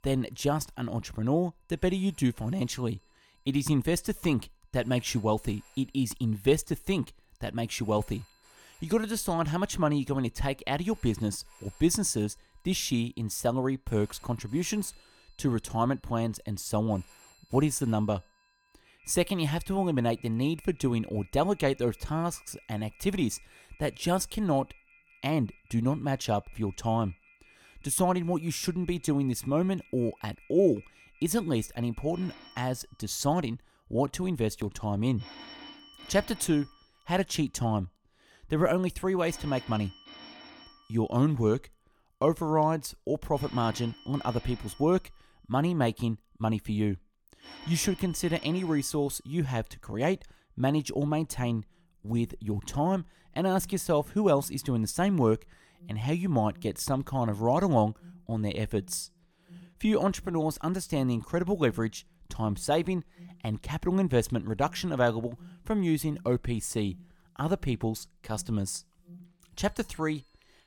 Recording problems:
alarms or sirens; faint; throughout; 25 dB below the speech

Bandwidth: 18 kHz